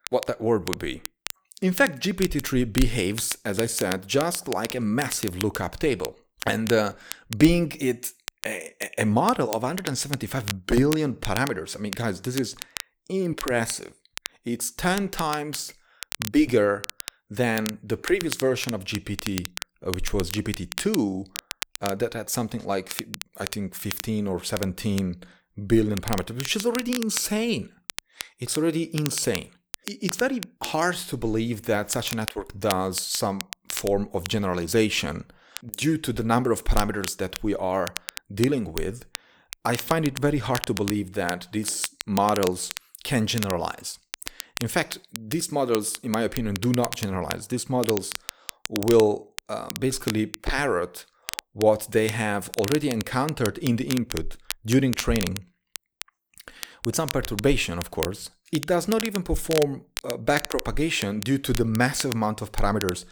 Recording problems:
crackle, like an old record; noticeable; 10 dB below the speech

